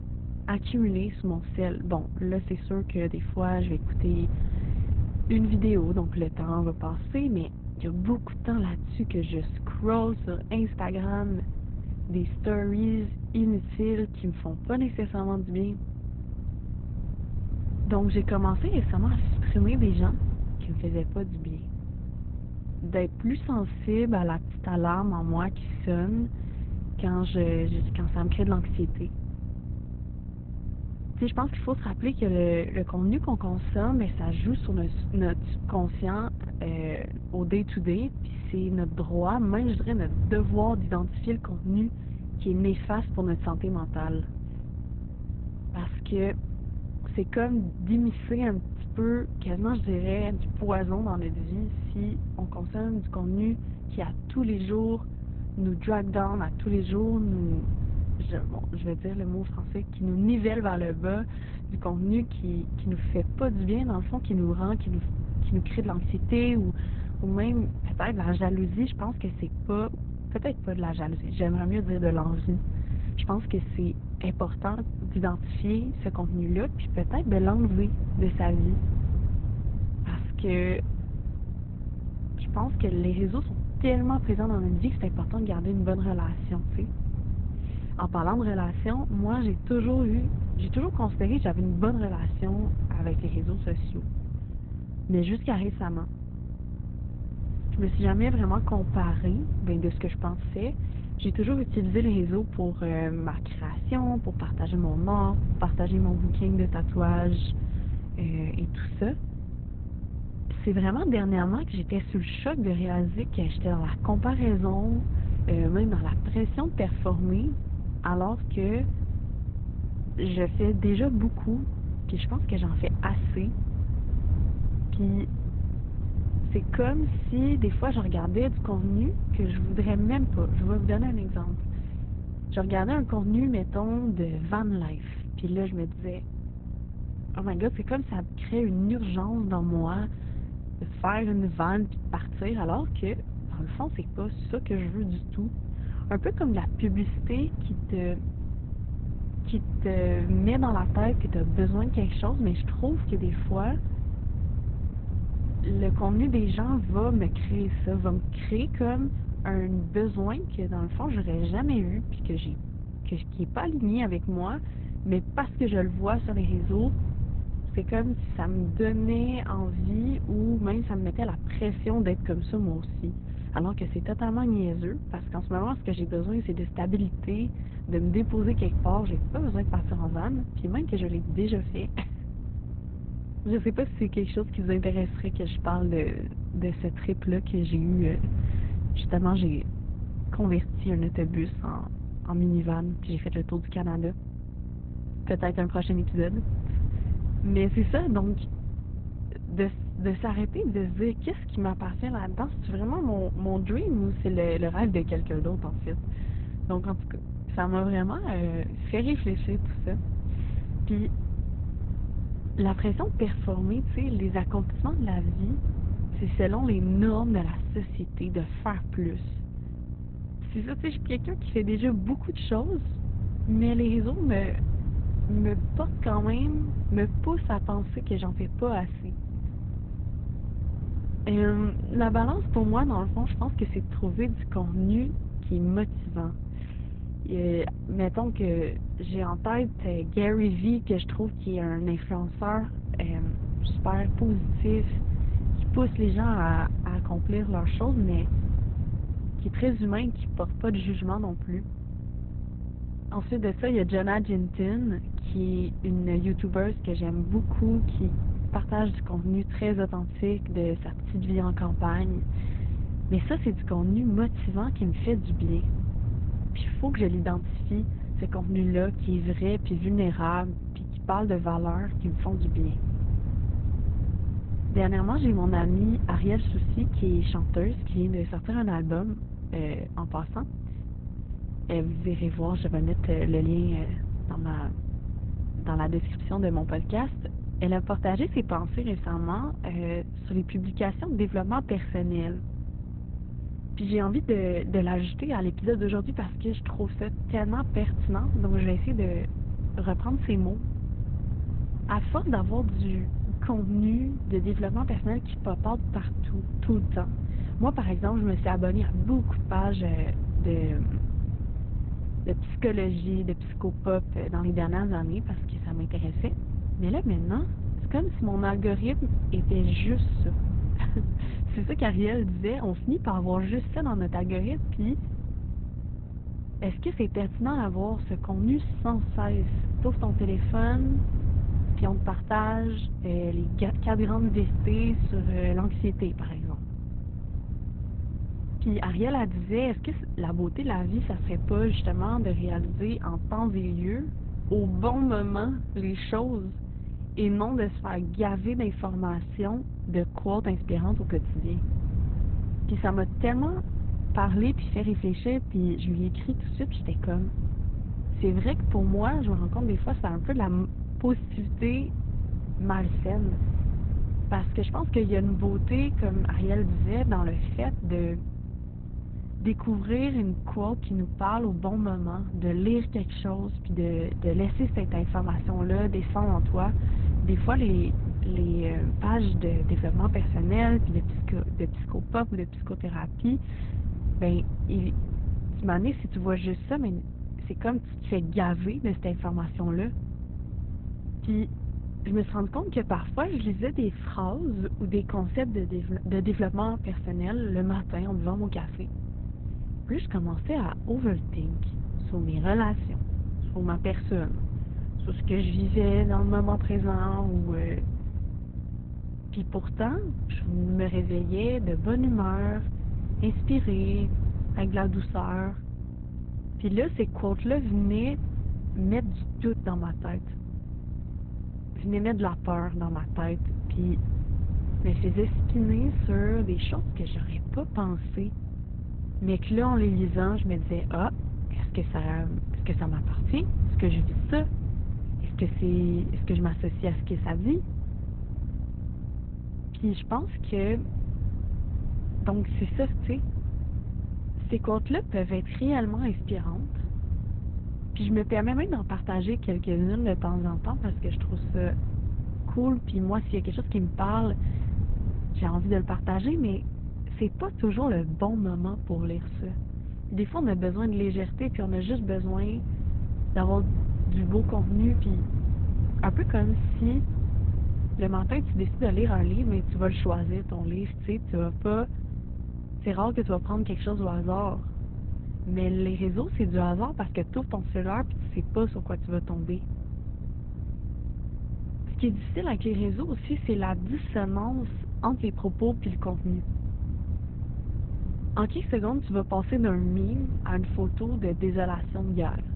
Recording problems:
garbled, watery; badly; nothing above 4 kHz
muffled; very slightly; fading above 3.5 kHz
electrical hum; noticeable; throughout; 60 Hz, 15 dB below the speech
wind noise on the microphone; occasional gusts; 15 dB below the speech

